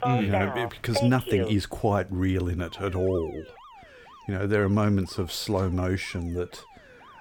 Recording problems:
alarms or sirens; loud; throughout; 5 dB below the speech

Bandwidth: 18.5 kHz